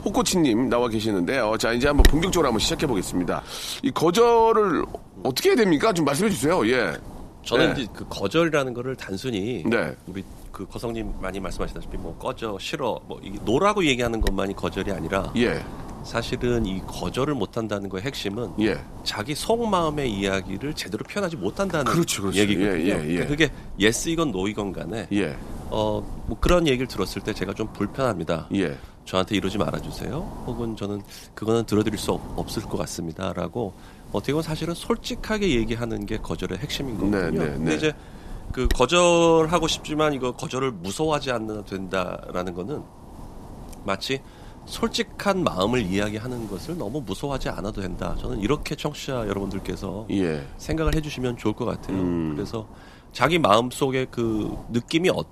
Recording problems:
wind noise on the microphone; occasional gusts; 15 dB below the speech

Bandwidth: 14 kHz